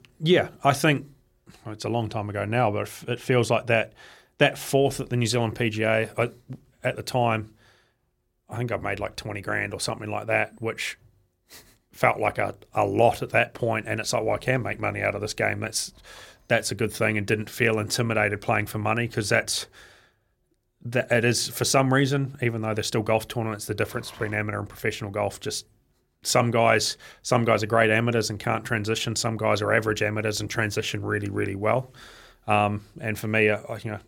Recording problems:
none

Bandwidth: 16.5 kHz